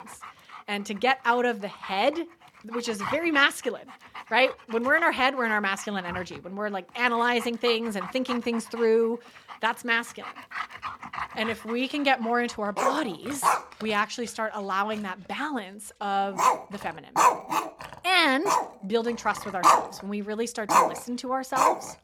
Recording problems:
animal sounds; loud; throughout; 1 dB below the speech

